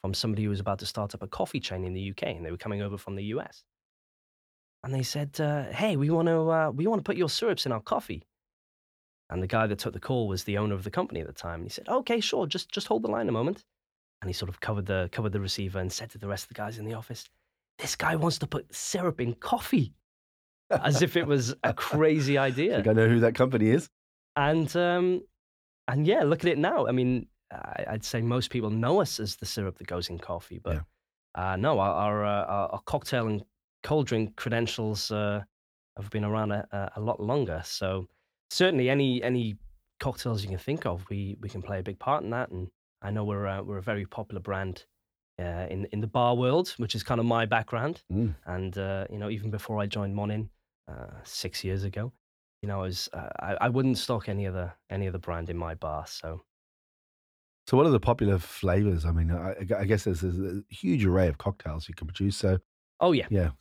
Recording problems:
none

